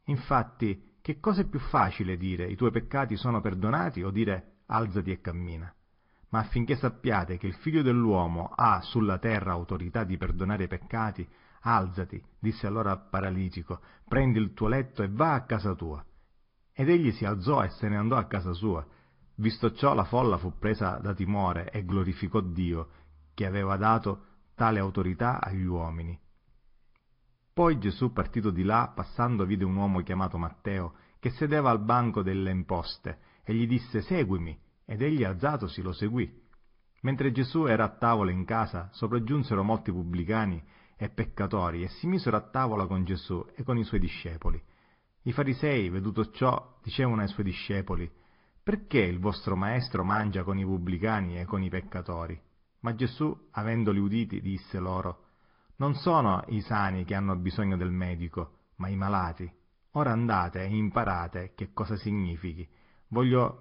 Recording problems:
high frequencies cut off; noticeable; nothing above 5 kHz
garbled, watery; slightly
muffled; very slightly; fading above 3.5 kHz

